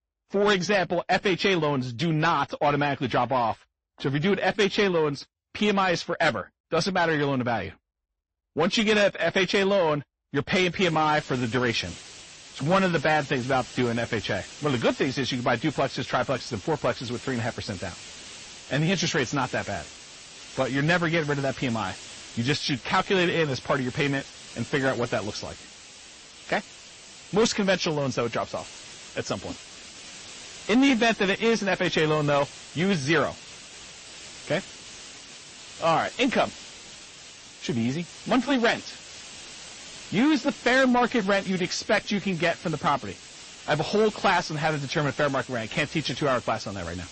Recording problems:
distortion; slight; 10 dB below the speech
garbled, watery; slightly; nothing above 8 kHz
hiss; noticeable; from 11 s on; 15 dB below the speech

